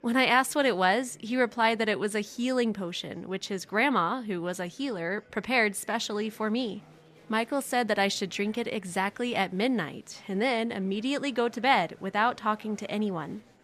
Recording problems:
murmuring crowd; faint; throughout; 30 dB below the speech

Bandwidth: 14.5 kHz